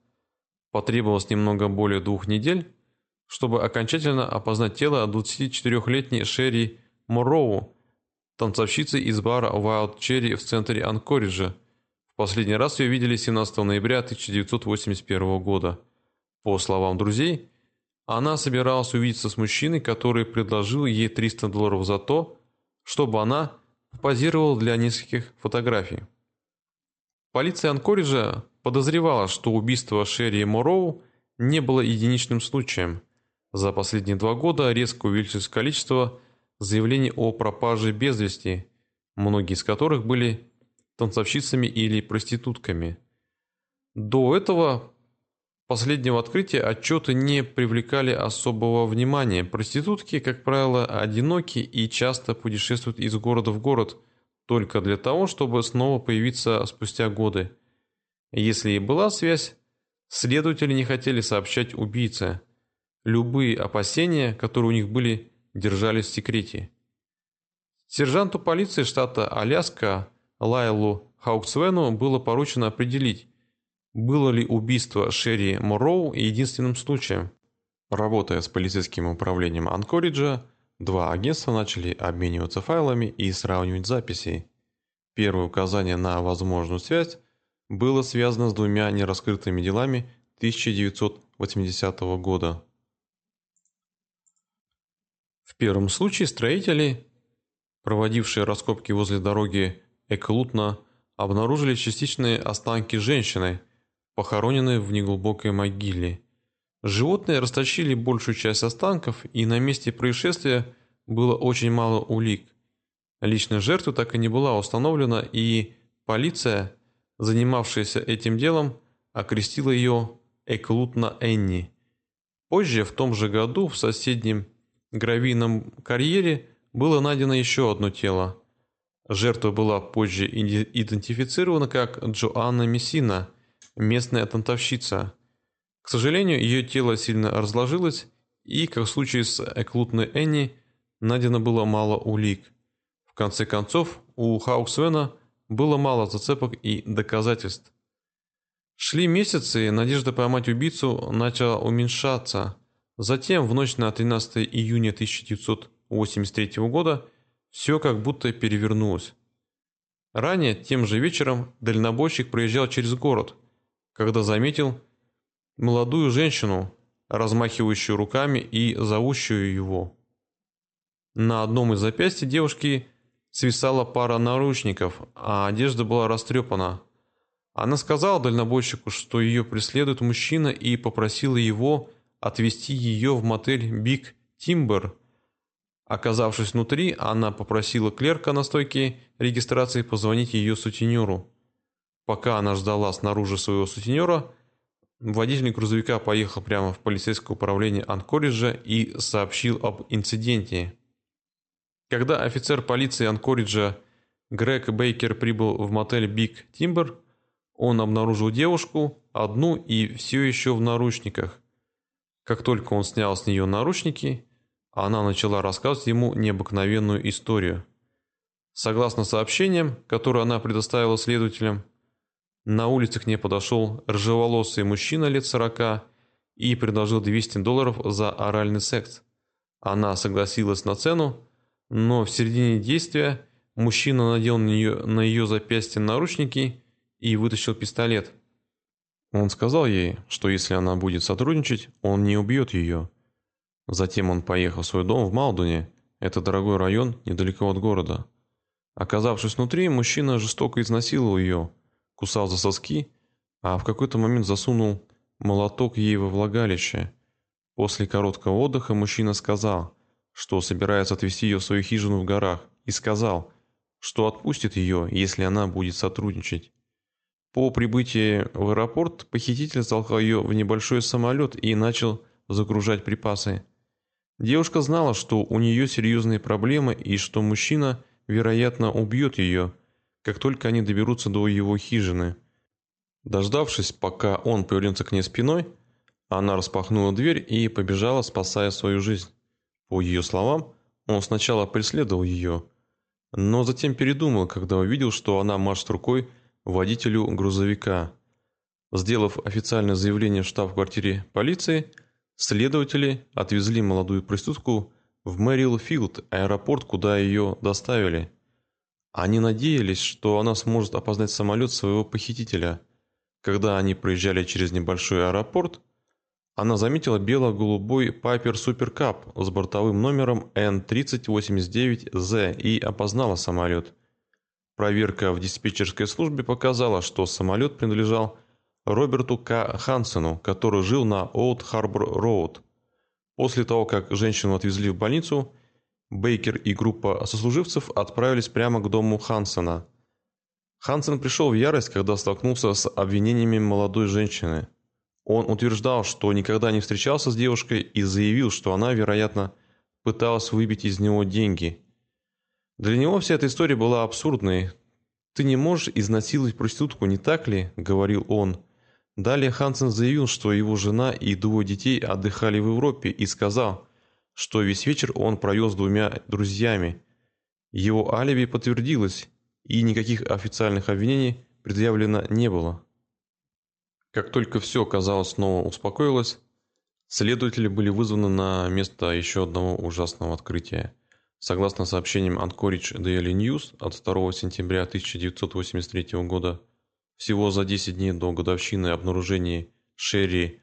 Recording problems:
high frequencies cut off; noticeable; nothing above 8 kHz

